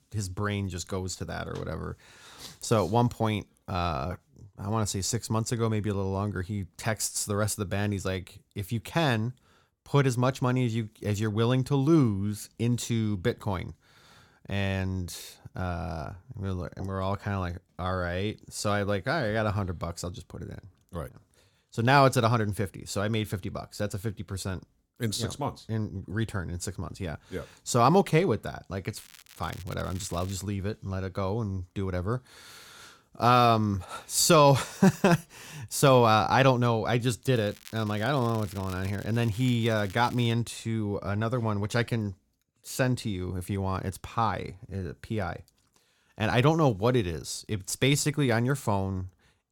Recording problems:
crackling; faint; from 29 to 30 s and from 37 to 40 s; 20 dB below the speech

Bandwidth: 17 kHz